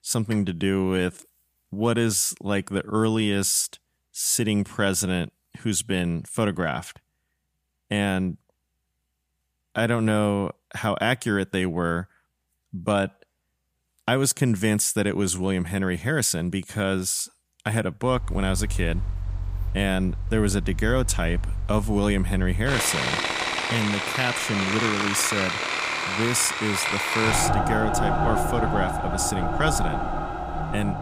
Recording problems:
machinery noise; loud; from 18 s on; 2 dB below the speech

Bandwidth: 15 kHz